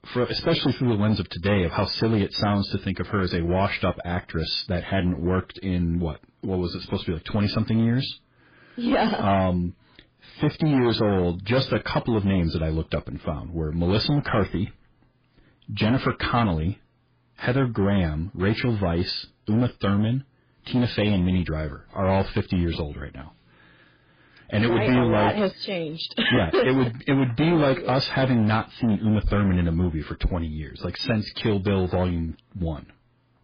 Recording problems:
garbled, watery; badly; nothing above 5 kHz
distortion; slight; 8% of the sound clipped

